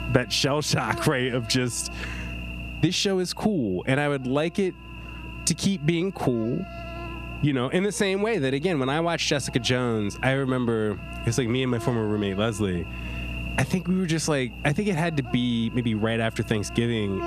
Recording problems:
squashed, flat; somewhat
electrical hum; noticeable; throughout; 60 Hz, 15 dB below the speech

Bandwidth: 14.5 kHz